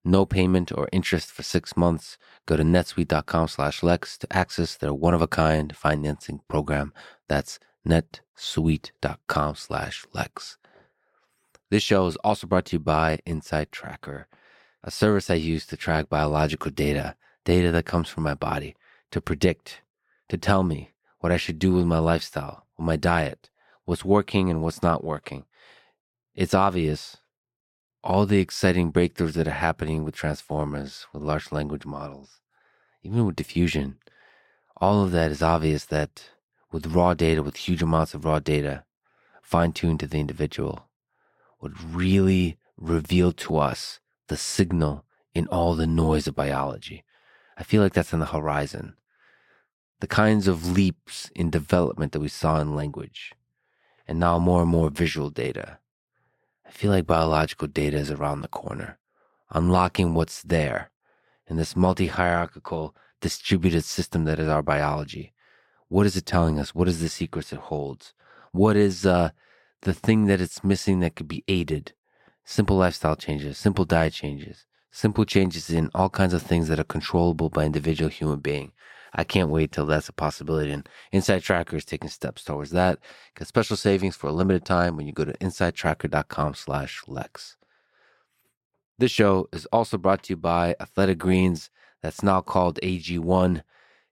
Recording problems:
none

